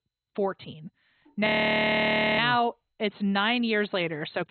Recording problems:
garbled, watery; badly; nothing above 4 kHz
audio freezing; at 1.5 s for 1 s

